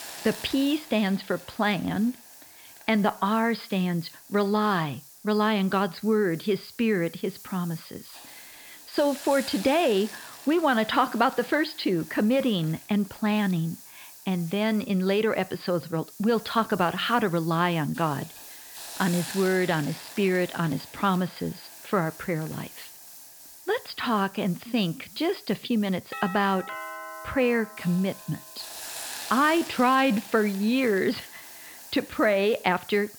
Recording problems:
high frequencies cut off; noticeable; nothing above 5 kHz
hiss; noticeable; throughout; 15 dB below the speech
doorbell; noticeable; from 26 to 28 s; peak 10 dB below the speech

